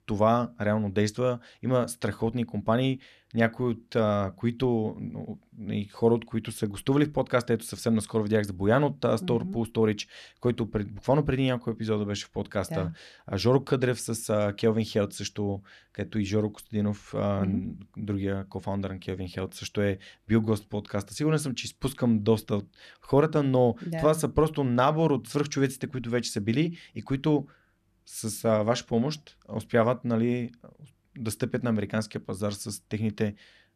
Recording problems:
none

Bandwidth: 14 kHz